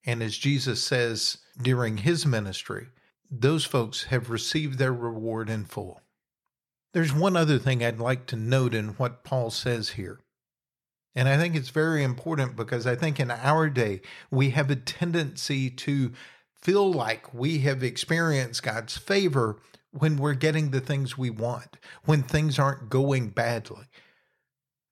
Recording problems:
none

